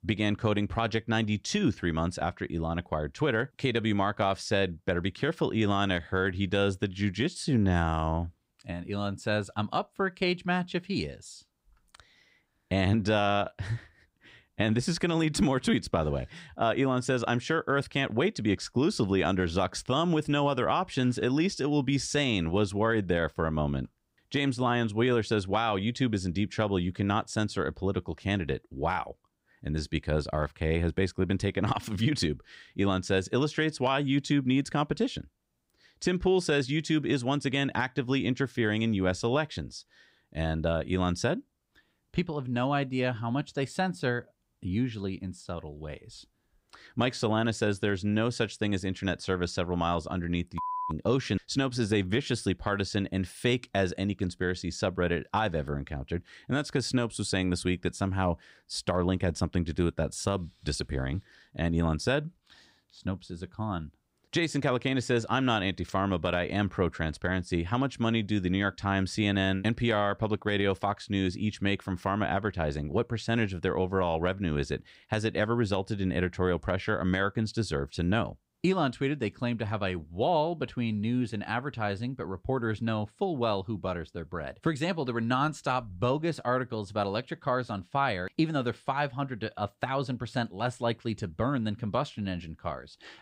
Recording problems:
none

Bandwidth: 15.5 kHz